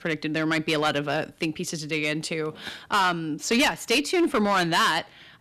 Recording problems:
distortion; heavy; 6% of the sound clipped

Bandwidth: 14 kHz